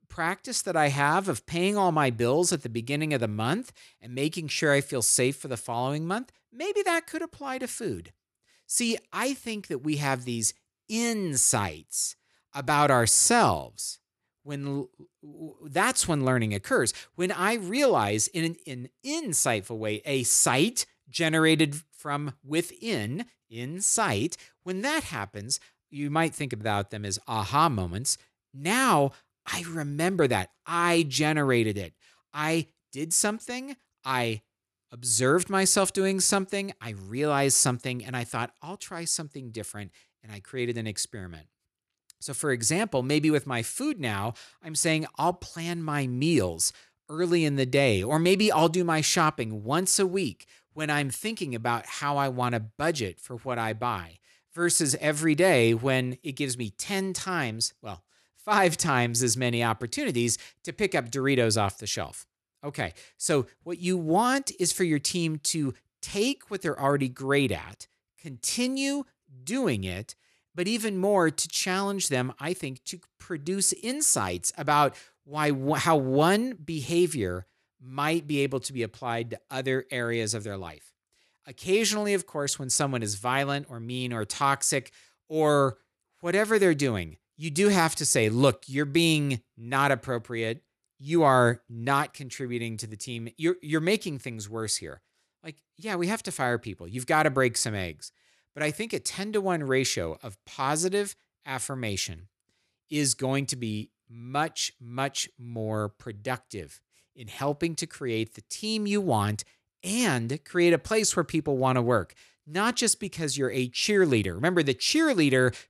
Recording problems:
none

